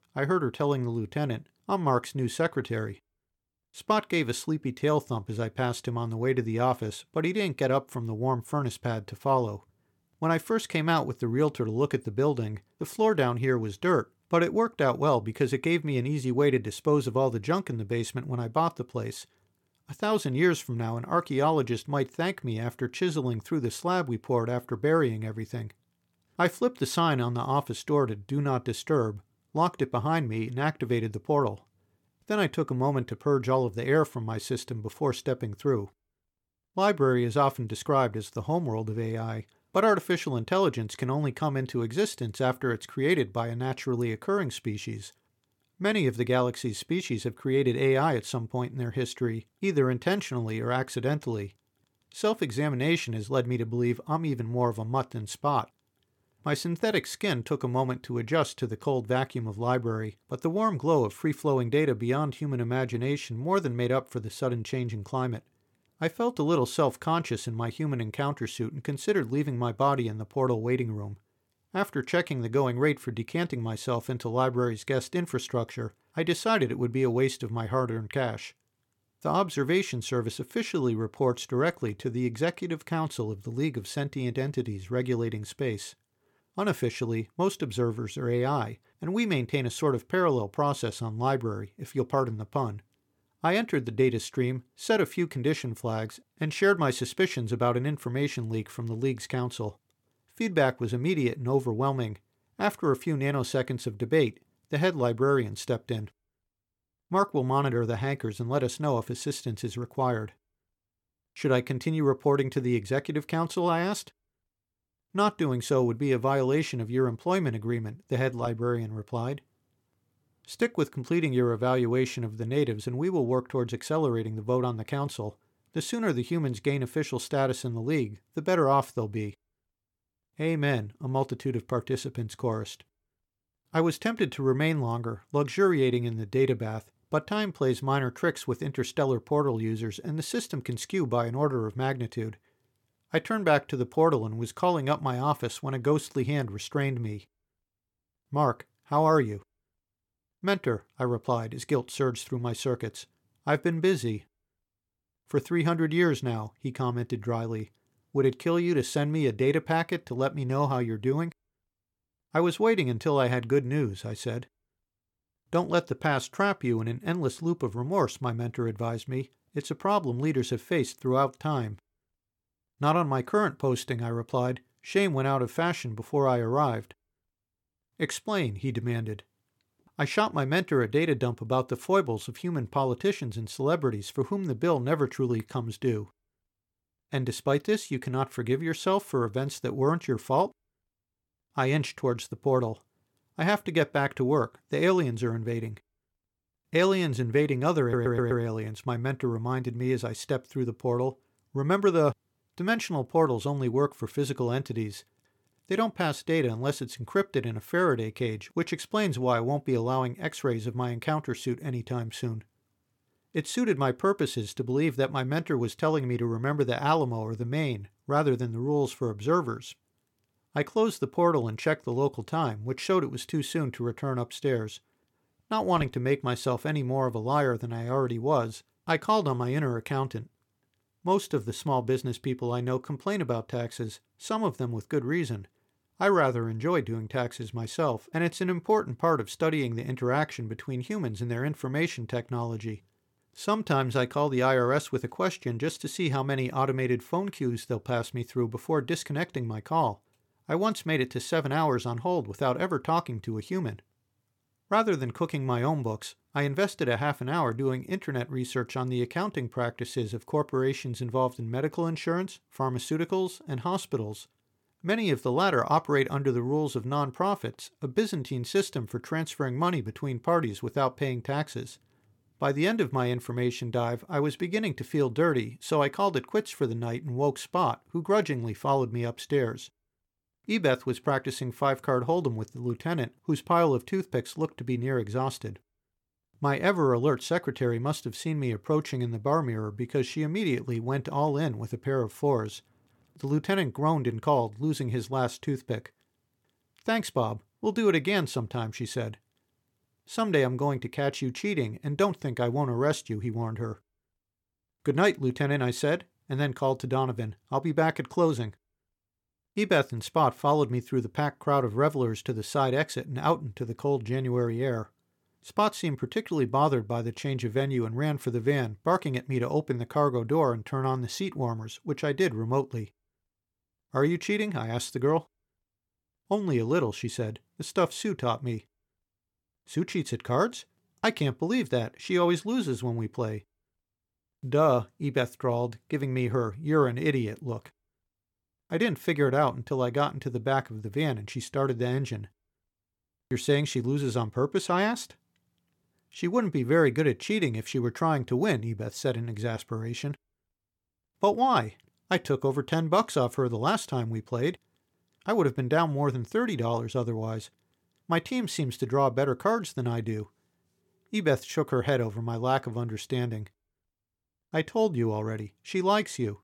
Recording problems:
audio stuttering; at 3:18

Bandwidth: 17 kHz